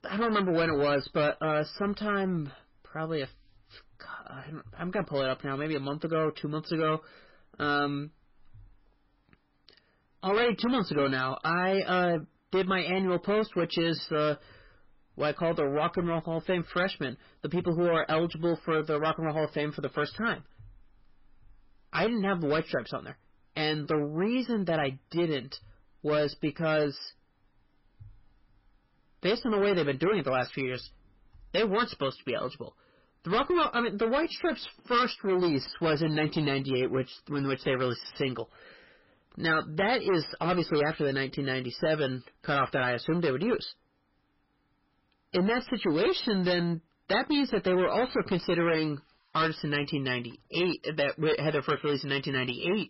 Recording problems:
distortion; heavy; 11% of the sound clipped
garbled, watery; badly; nothing above 5.5 kHz

